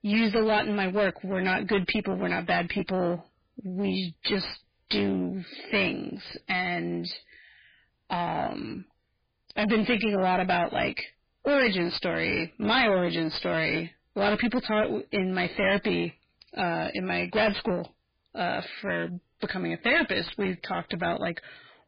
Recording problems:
distortion; heavy; 11% of the sound clipped
garbled, watery; badly; nothing above 4.5 kHz

